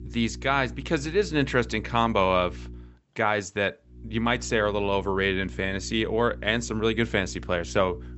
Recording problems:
high frequencies cut off; noticeable; nothing above 8 kHz
electrical hum; faint; until 3 s and from 4 s on; 60 Hz, 25 dB below the speech

